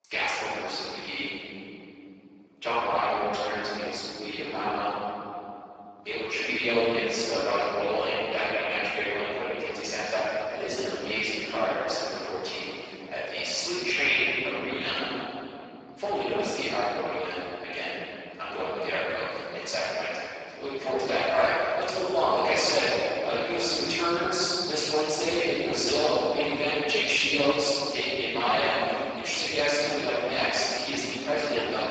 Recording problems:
room echo; strong; dies away in 3 s
off-mic speech; far
garbled, watery; badly; nothing above 7.5 kHz
thin; somewhat; fading below 550 Hz

